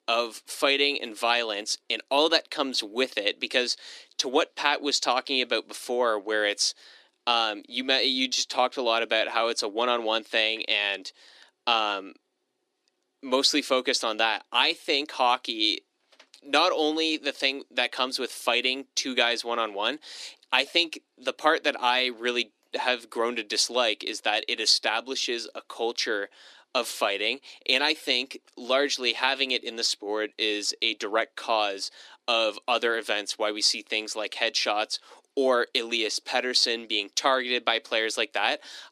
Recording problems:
thin; somewhat; fading below 300 Hz

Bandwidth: 14.5 kHz